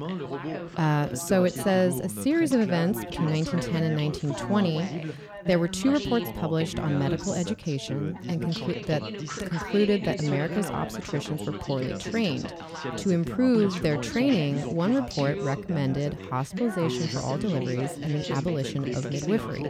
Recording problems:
background chatter; loud; throughout; 3 voices, 7 dB below the speech

